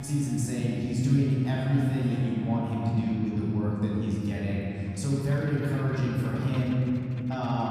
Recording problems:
room echo; strong; dies away in 3 s
off-mic speech; far
background music; very faint; throughout; 25 dB below the speech
abrupt cut into speech; at the start and the end

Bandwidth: 14.5 kHz